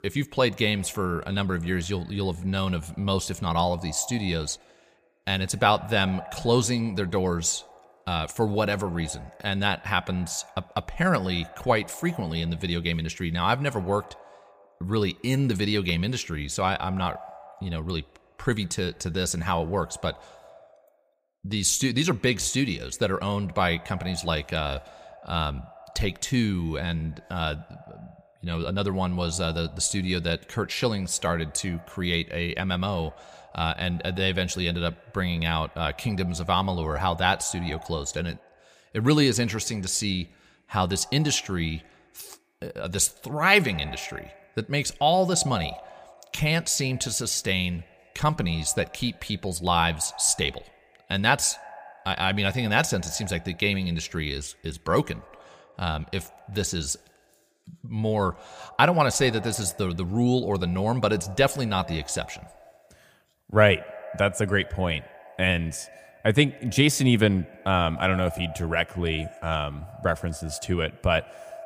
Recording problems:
echo of what is said; faint; throughout; 110 ms later, 20 dB below the speech

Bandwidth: 15 kHz